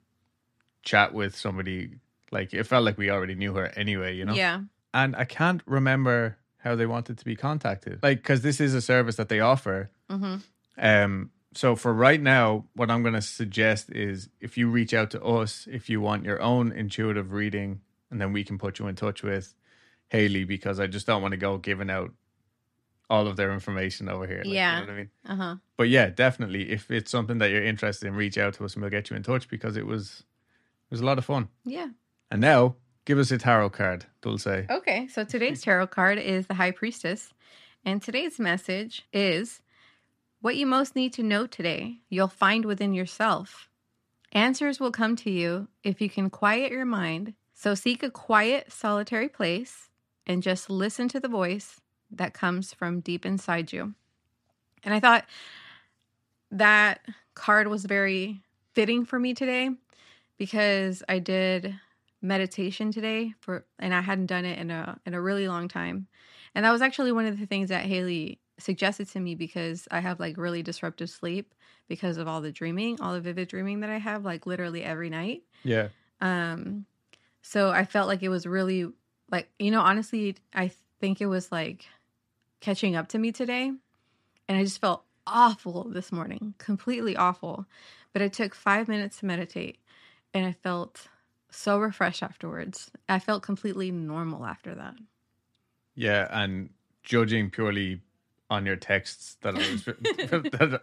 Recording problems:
none

